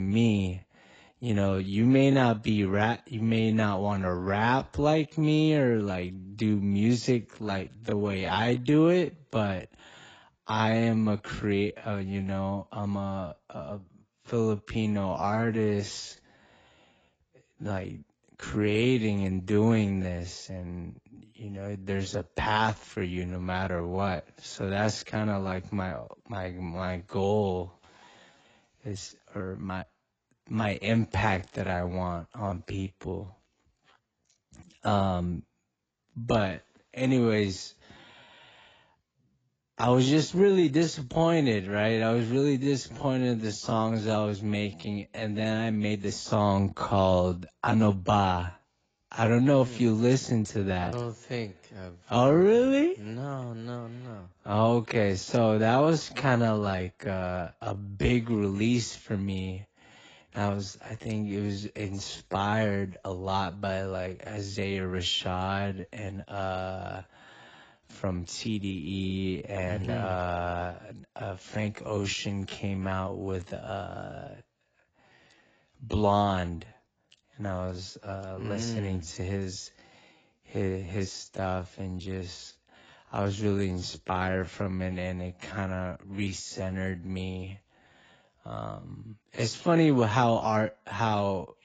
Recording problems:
garbled, watery; badly; nothing above 7.5 kHz
wrong speed, natural pitch; too slow; 0.6 times normal speed
abrupt cut into speech; at the start
uneven, jittery; slightly; from 7.5 to 48 s

